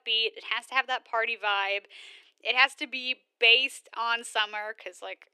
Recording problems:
thin; somewhat; fading below 350 Hz

